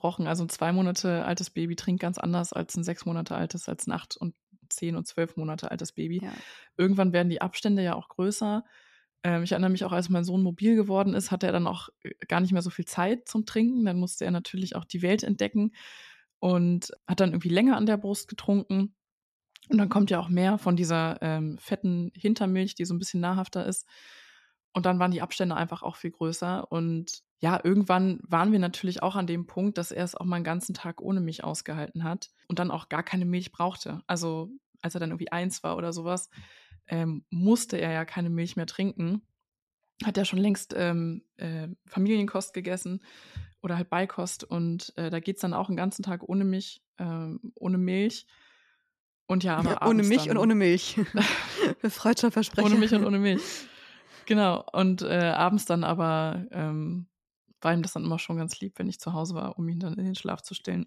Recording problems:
none

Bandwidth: 13.5 kHz